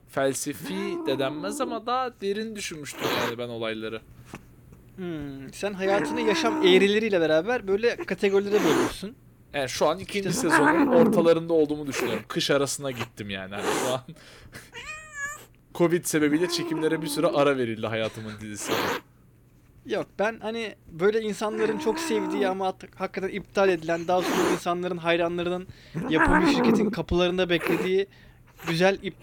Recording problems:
hiss; loud; throughout; 2 dB below the speech

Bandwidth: 17.5 kHz